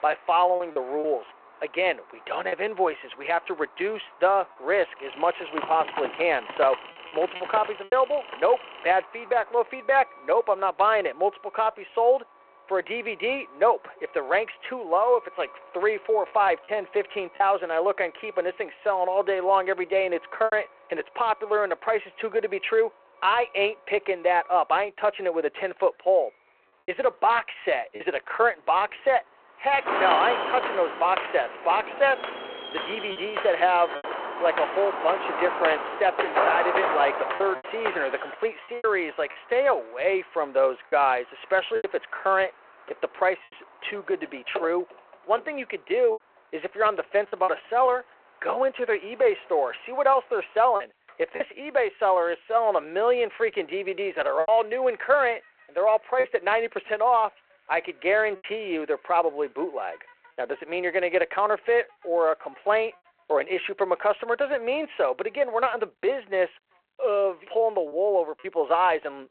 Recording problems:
phone-call audio
traffic noise; faint; throughout; 25 dB below the speech
choppy; occasionally; 3% of the speech affected
keyboard typing; noticeable; from 5 to 9 s and from 43 to 48 s; peak 8 dB below the speech
footsteps; loud; from 30 to 38 s; peak 2 dB above the speech

